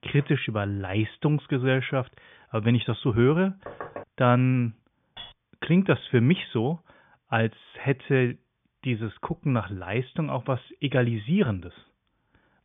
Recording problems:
high frequencies cut off; severe; nothing above 3.5 kHz
door banging; faint; at 3.5 s; peak 15 dB below the speech
clattering dishes; faint; at 5 s; peak 15 dB below the speech

